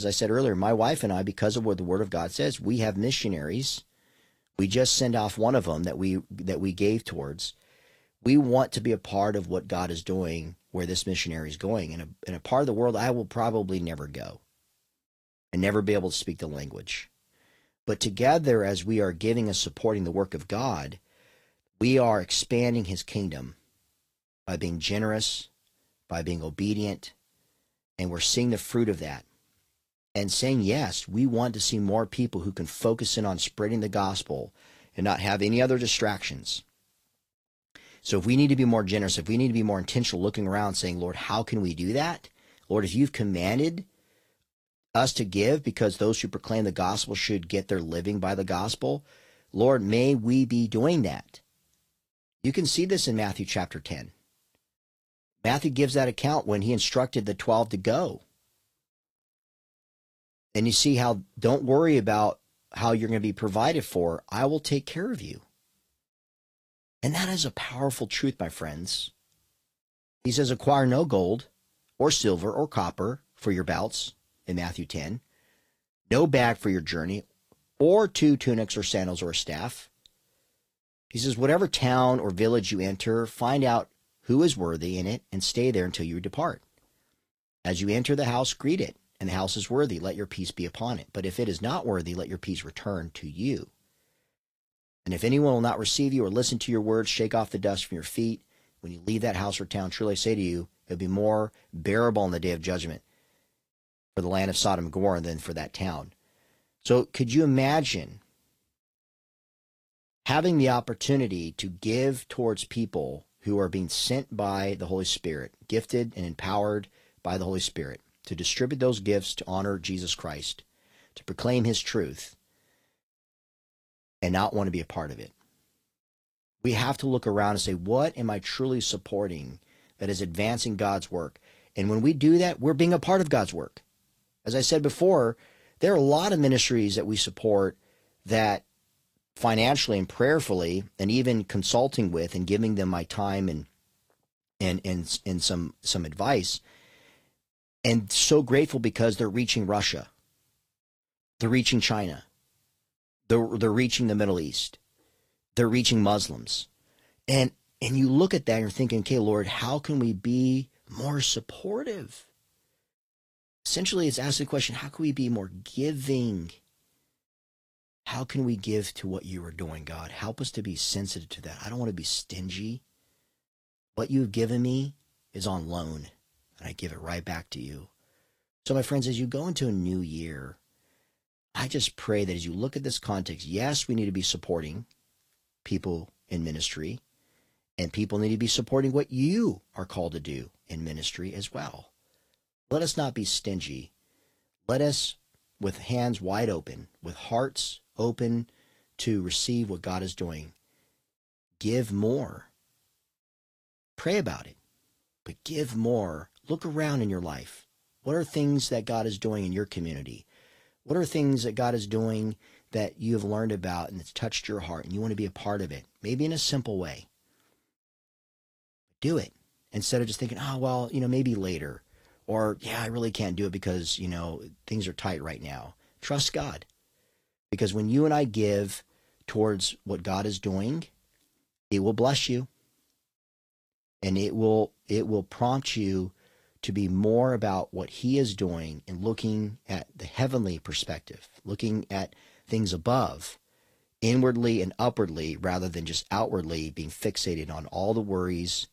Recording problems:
garbled, watery; slightly; nothing above 14.5 kHz
abrupt cut into speech; at the start

